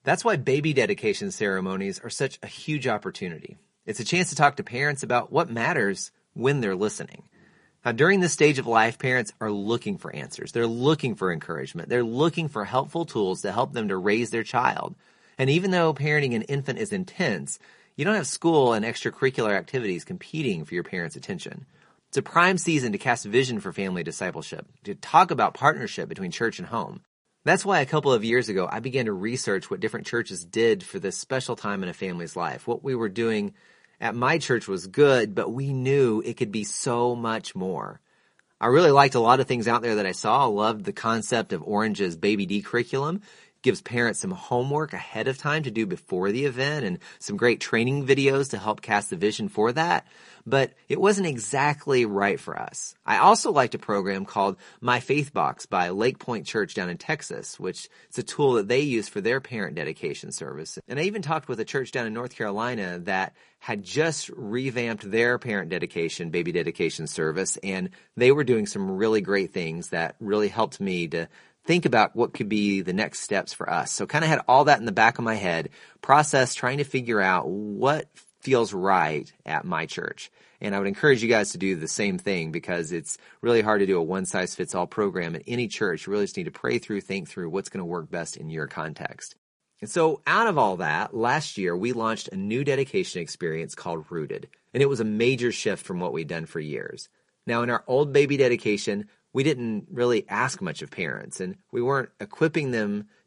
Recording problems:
garbled, watery; slightly; nothing above 10.5 kHz

